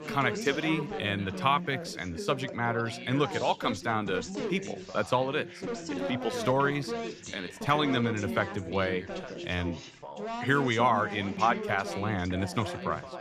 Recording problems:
background chatter; loud; throughout; 3 voices, 7 dB below the speech

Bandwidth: 14.5 kHz